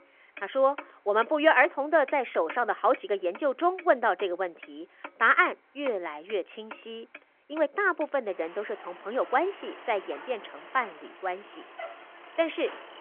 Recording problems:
phone-call audio
traffic noise; noticeable; throughout; 20 dB below the speech

